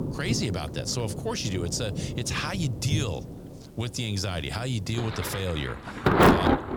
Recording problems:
rain or running water; very loud; throughout; 3 dB above the speech

